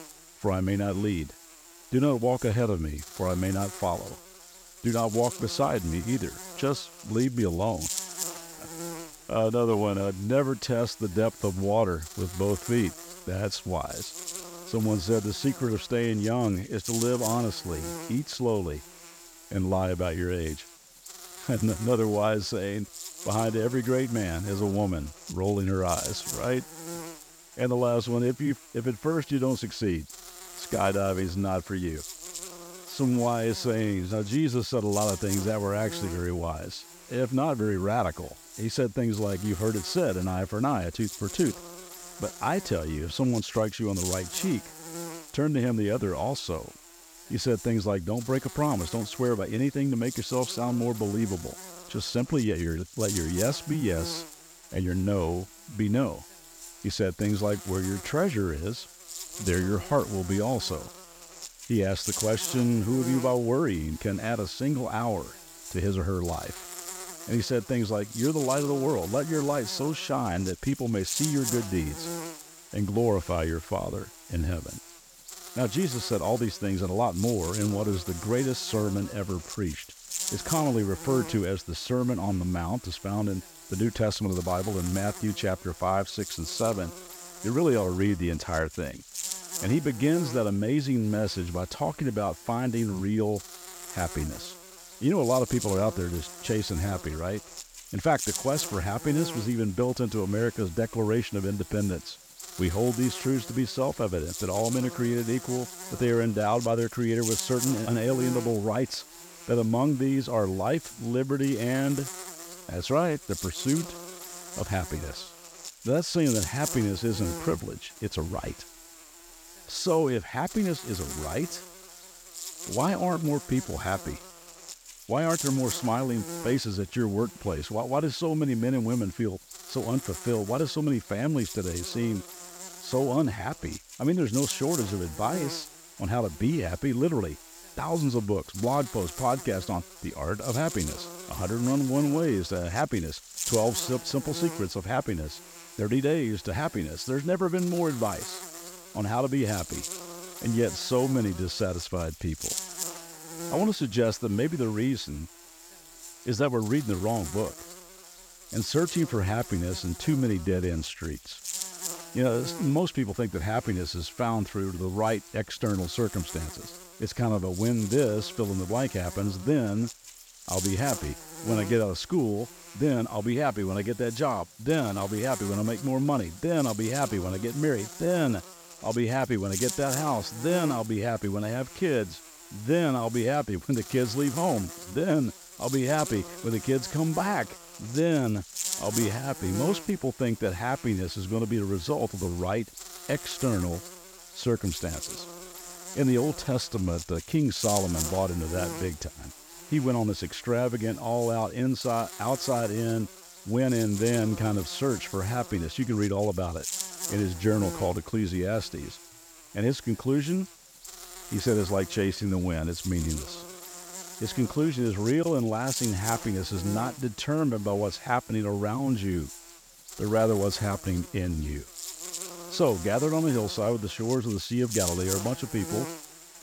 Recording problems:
electrical hum; loud; throughout; 60 Hz, 10 dB below the speech

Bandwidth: 18 kHz